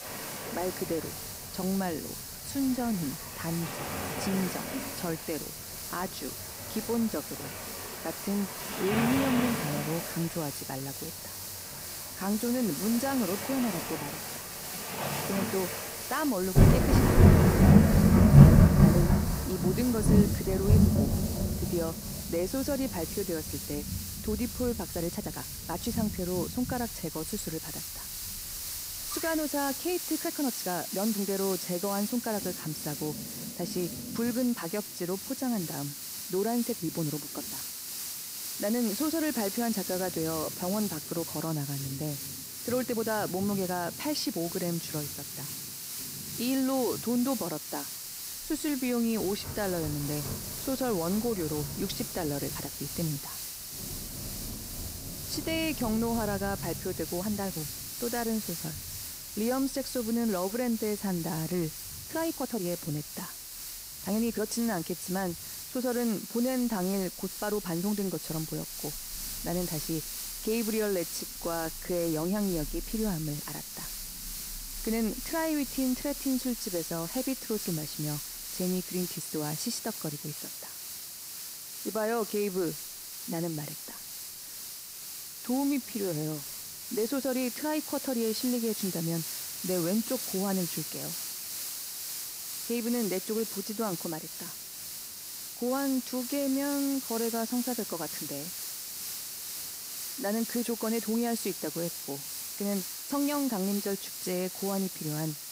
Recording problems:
rain or running water; very loud; throughout; 4 dB above the speech
hiss; loud; throughout; 4 dB below the speech
uneven, jittery; strongly; from 2 s to 1:43

